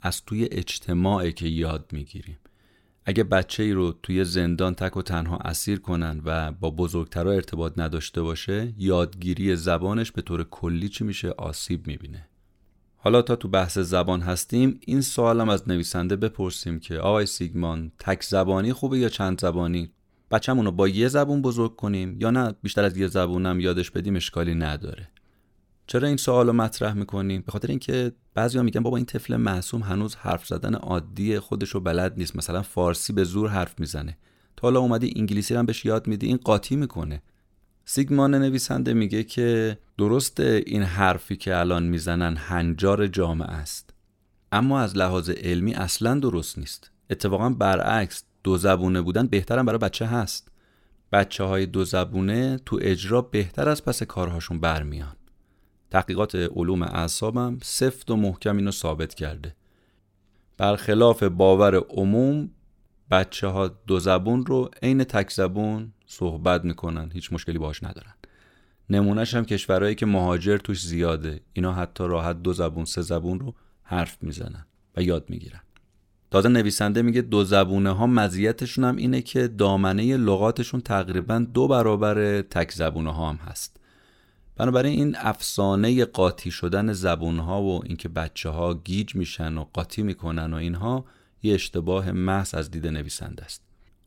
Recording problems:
uneven, jittery; strongly; from 1.5 s to 1:26

